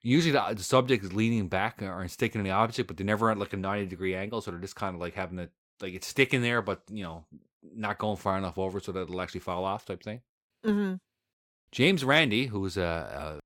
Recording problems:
none

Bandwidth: 17 kHz